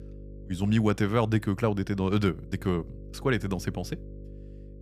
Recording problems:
electrical hum; faint; throughout; 50 Hz, 20 dB below the speech

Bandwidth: 14.5 kHz